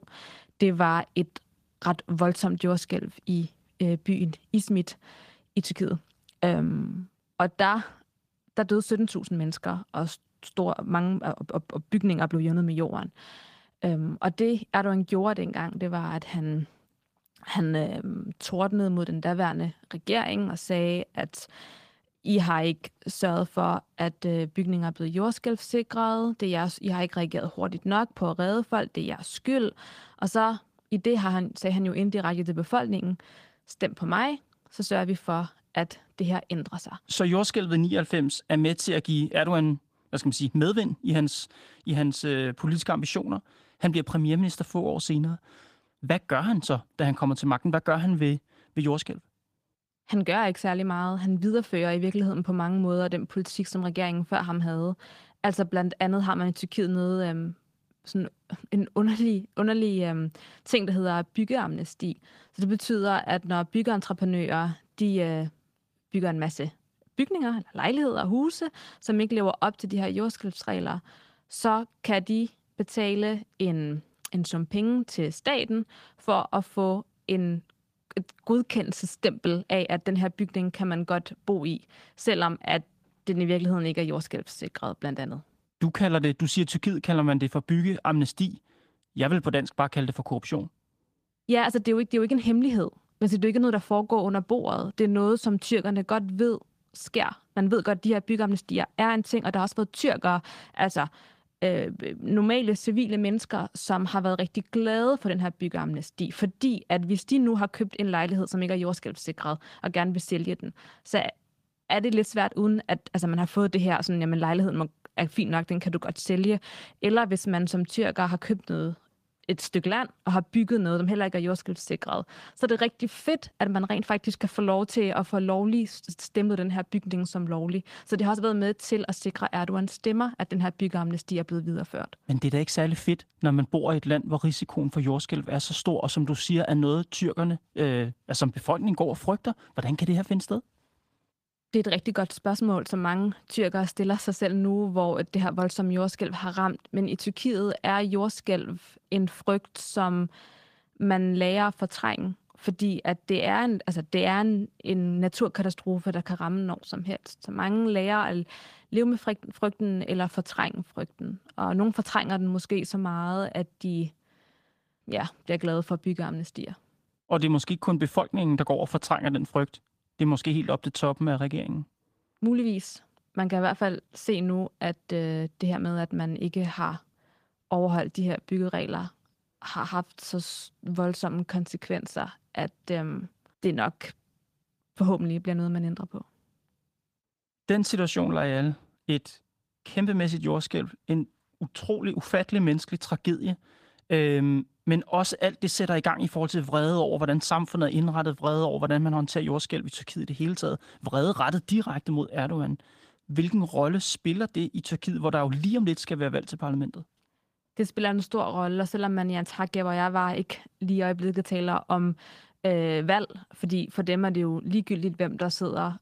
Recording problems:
garbled, watery; slightly; nothing above 15 kHz

